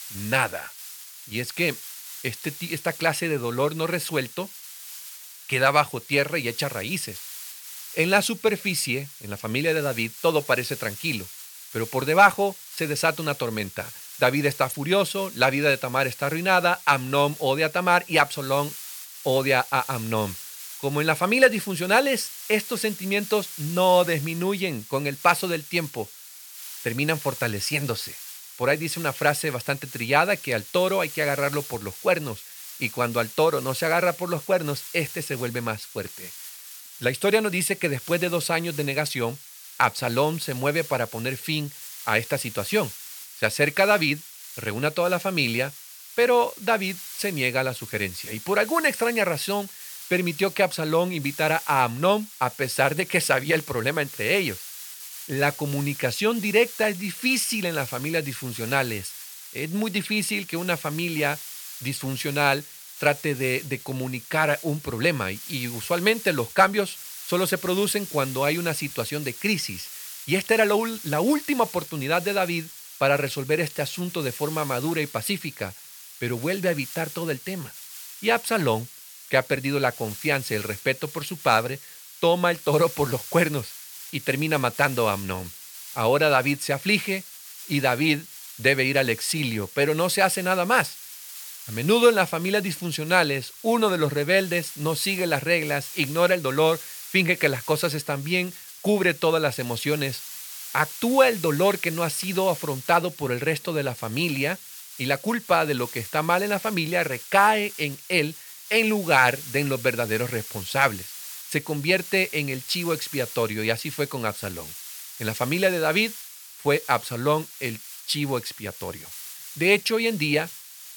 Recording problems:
hiss; noticeable; throughout; 15 dB below the speech

